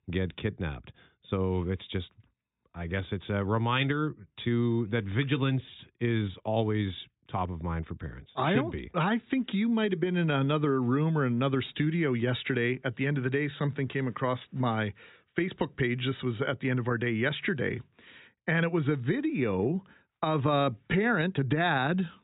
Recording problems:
high frequencies cut off; severe; nothing above 4 kHz

